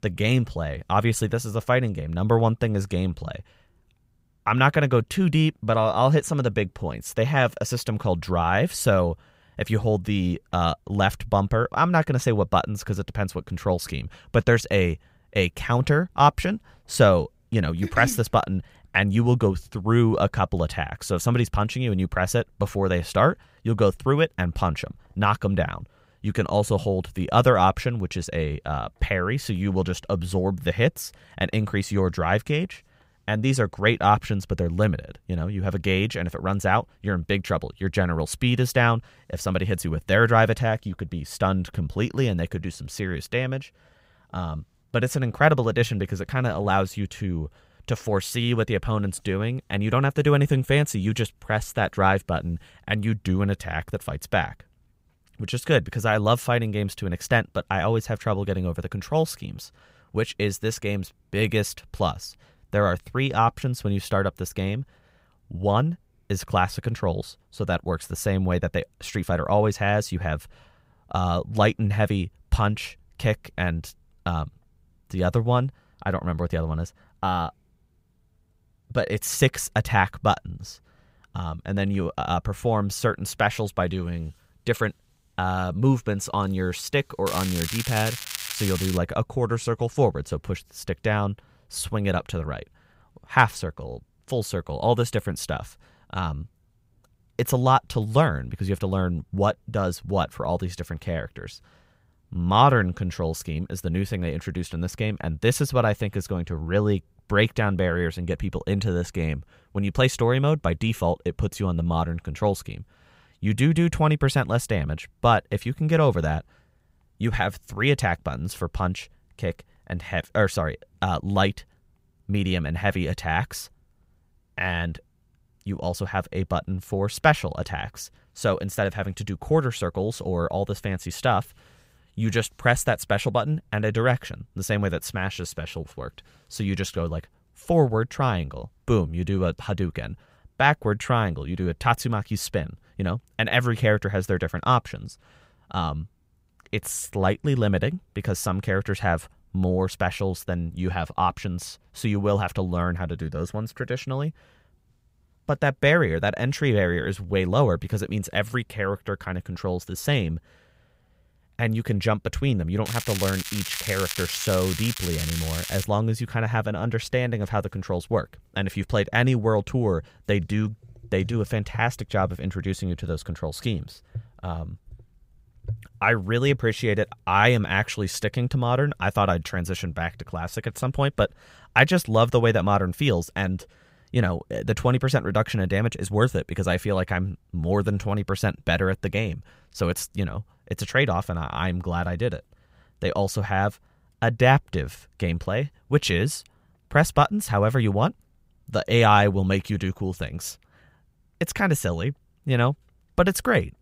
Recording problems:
crackling; loud; from 1:27 to 1:29 and from 2:43 to 2:46; 6 dB below the speech

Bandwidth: 15.5 kHz